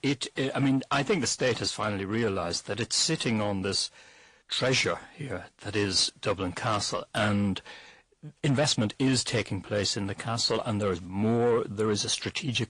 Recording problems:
distortion; slight; 10 dB below the speech
garbled, watery; slightly
uneven, jittery; slightly; from 2 to 9 s

